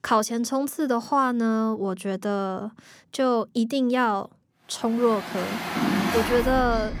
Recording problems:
traffic noise; loud; from 5.5 s on; 3 dB below the speech

